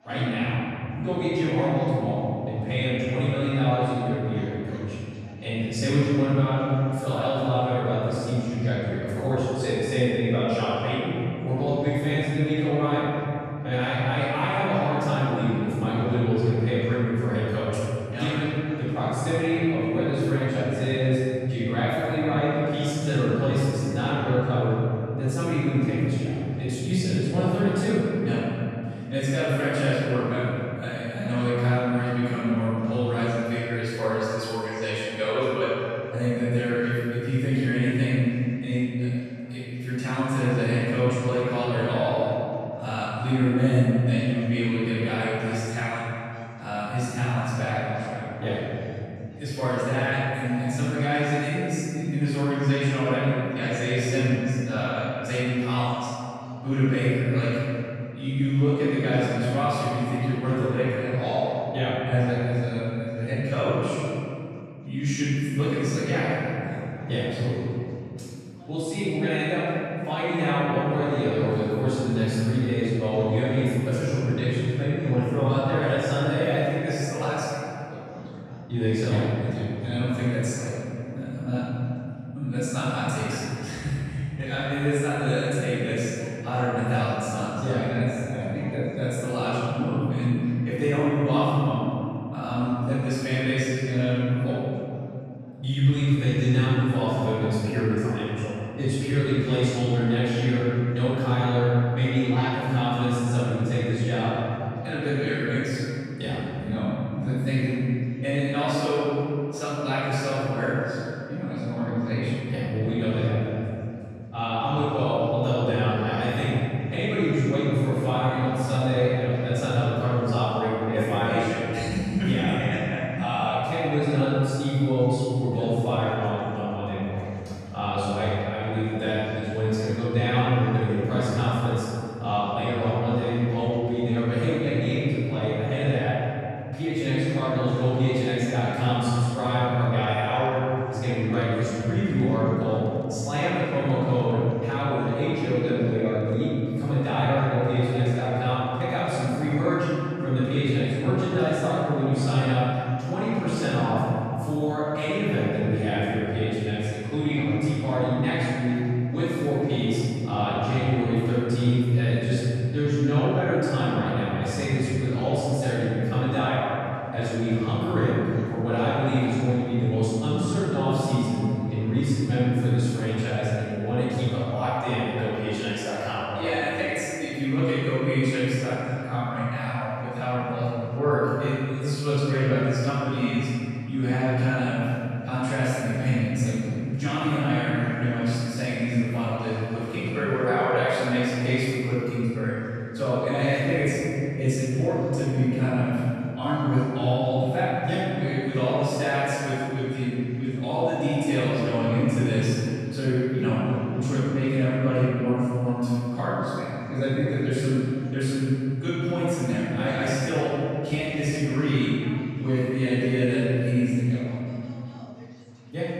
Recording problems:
room echo; strong; dies away in 2.9 s
off-mic speech; far
chatter from many people; faint; throughout; 30 dB below the speech

